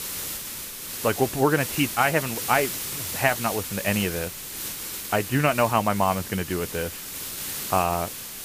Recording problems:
high frequencies cut off; severe; nothing above 3 kHz
hiss; loud; throughout; 6 dB below the speech

